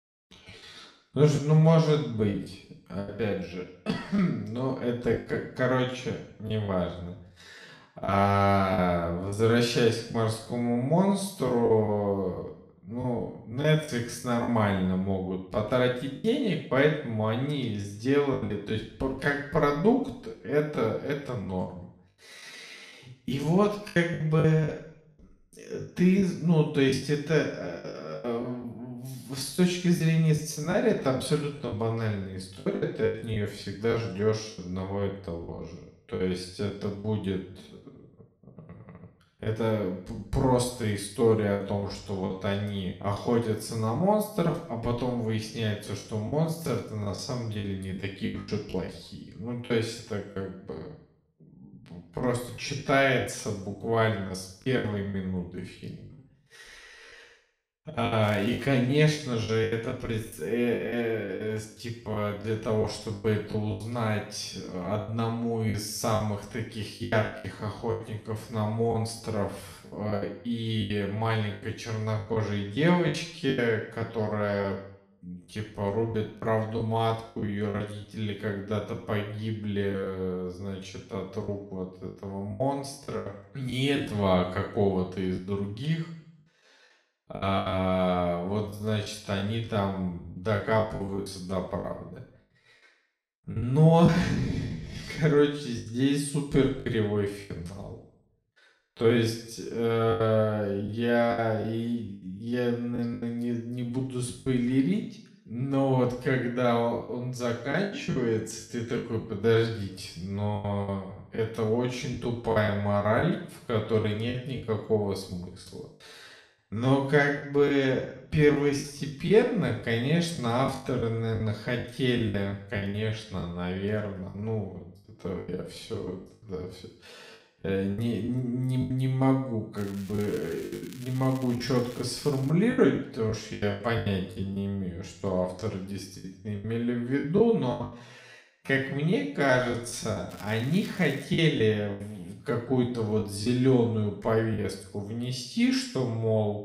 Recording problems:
wrong speed, natural pitch; too slow; 0.6 times normal speed
room echo; slight; dies away in 0.7 s
off-mic speech; somewhat distant
crackling; faint; at 58 s, from 2:10 to 2:13 and at 2:20; 20 dB below the speech
choppy; very; 8% of the speech affected

